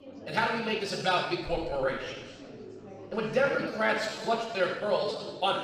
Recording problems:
room echo; strong; dies away in 1.1 s
off-mic speech; far
chatter from many people; noticeable; throughout; 15 dB below the speech
uneven, jittery; strongly

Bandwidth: 15 kHz